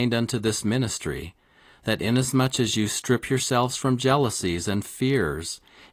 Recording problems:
garbled, watery; slightly; nothing above 15 kHz
abrupt cut into speech; at the start

